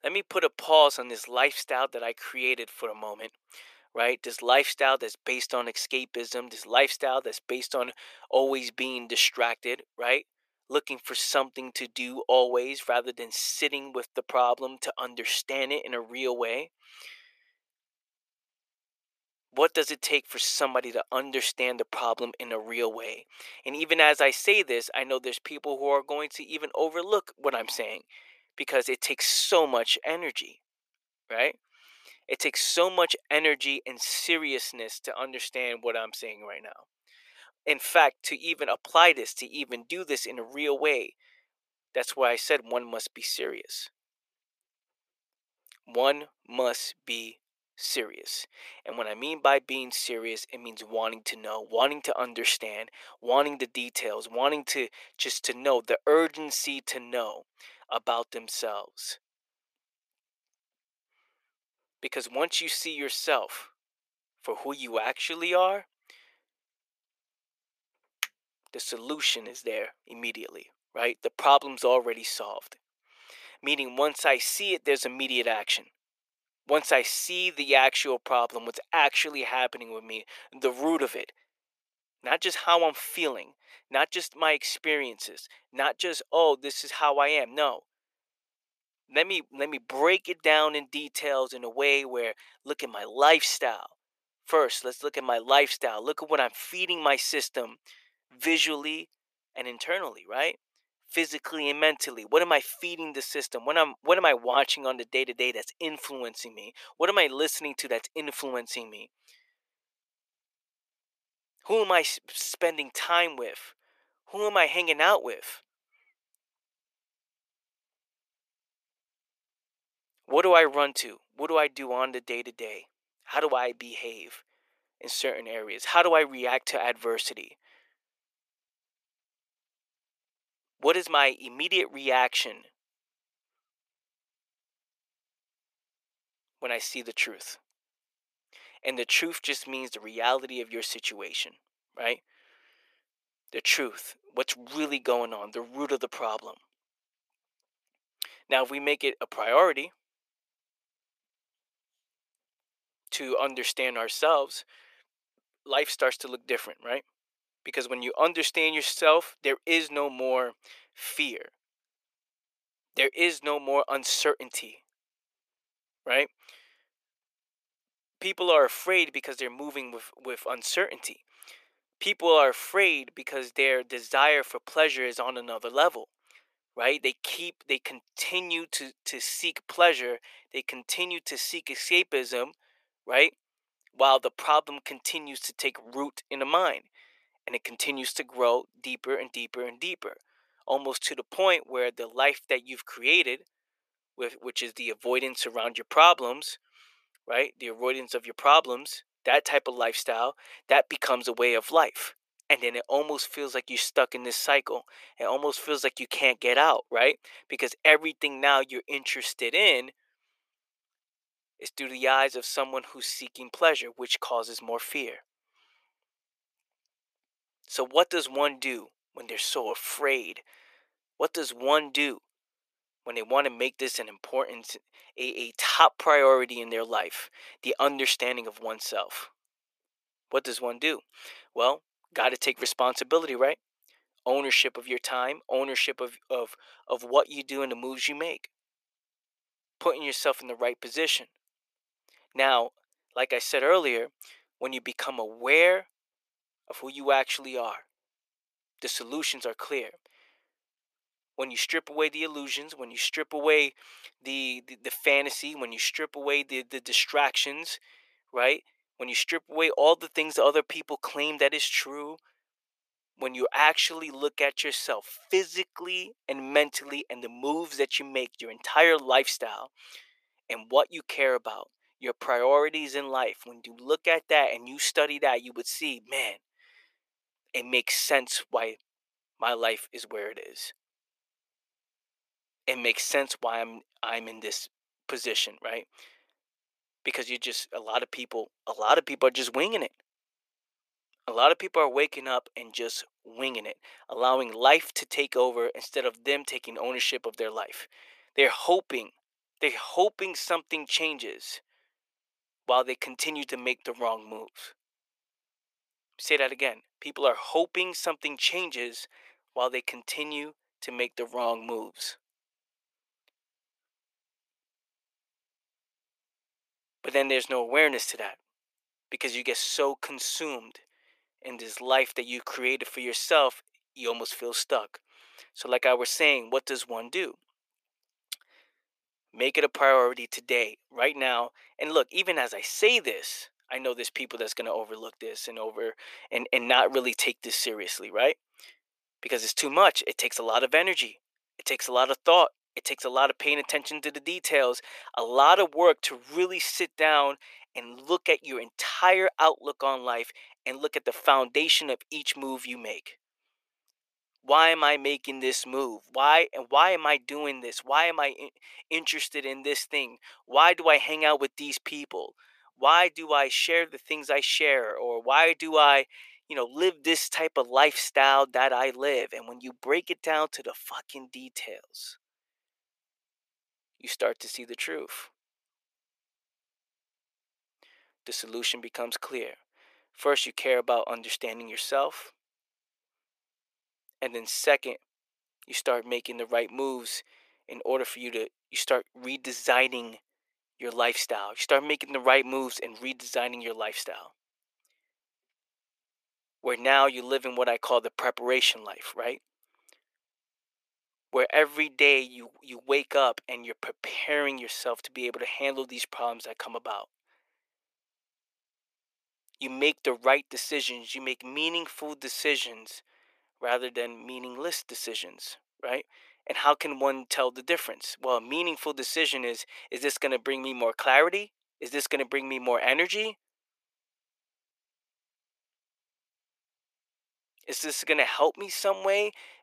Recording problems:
thin; very; fading below 450 Hz

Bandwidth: 14.5 kHz